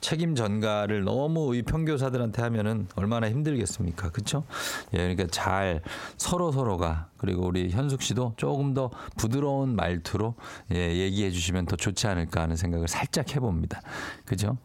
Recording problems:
squashed, flat; heavily

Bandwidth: 16.5 kHz